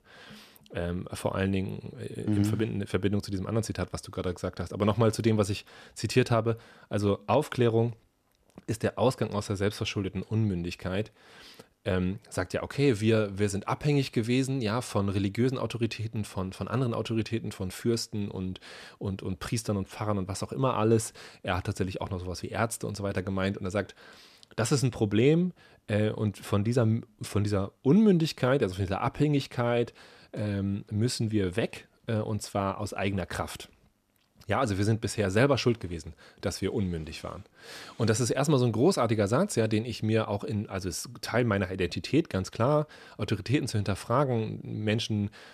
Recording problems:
none

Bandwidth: 14.5 kHz